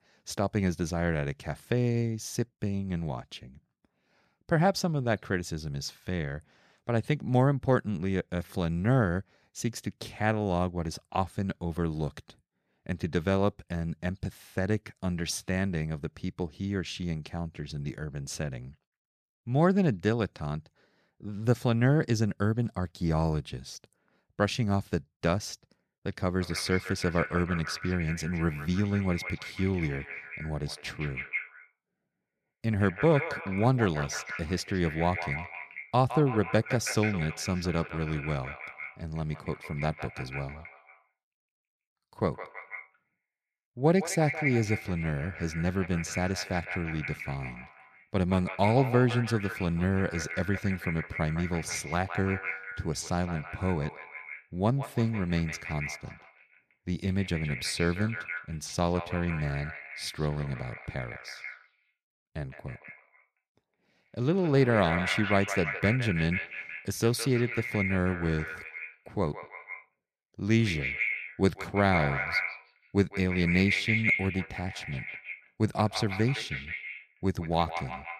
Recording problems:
echo of what is said; strong; from 26 s on; 160 ms later, 6 dB below the speech

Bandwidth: 14.5 kHz